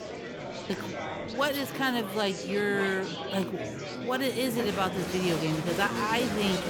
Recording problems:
murmuring crowd; loud; throughout; 5 dB below the speech

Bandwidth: 17.5 kHz